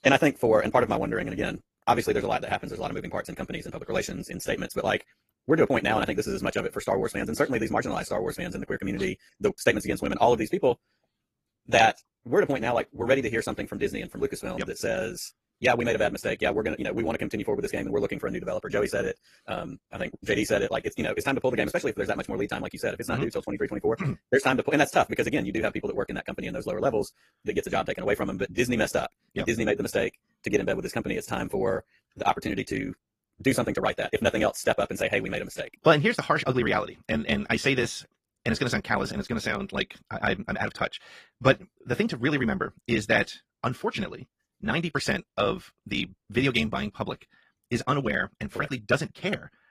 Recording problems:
wrong speed, natural pitch; too fast; 1.8 times normal speed
garbled, watery; slightly

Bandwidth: 15 kHz